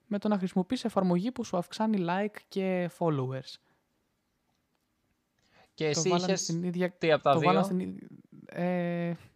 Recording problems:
none

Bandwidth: 15 kHz